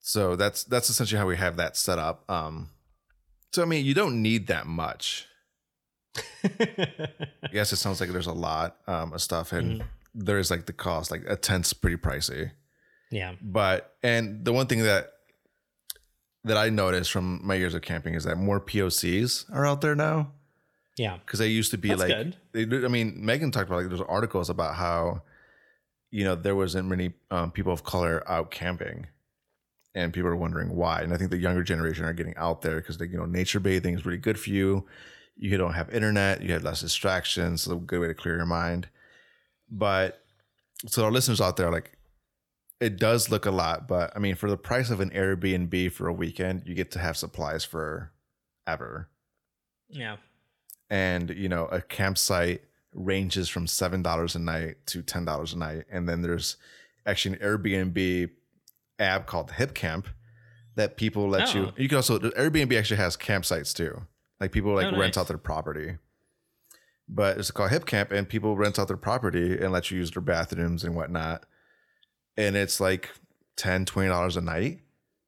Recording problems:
none

